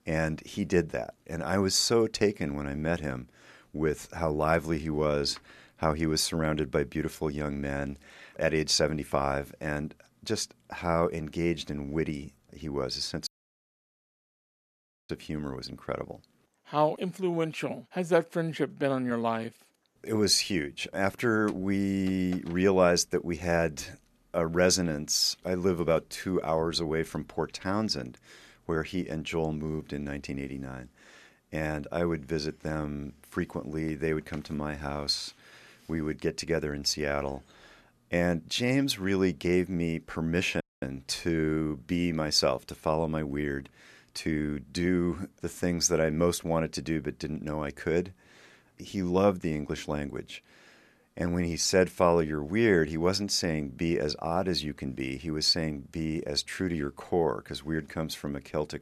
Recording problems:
audio cutting out; at 13 s for 2 s and at 41 s

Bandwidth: 13.5 kHz